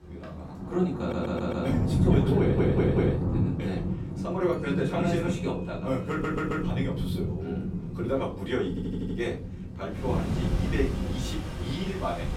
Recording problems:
off-mic speech; far
room echo; slight; dies away in 0.3 s
rain or running water; very loud; throughout; 1 dB above the speech
household noises; very faint; throughout; 25 dB below the speech
audio stuttering; 4 times, first at 1 s

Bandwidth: 16.5 kHz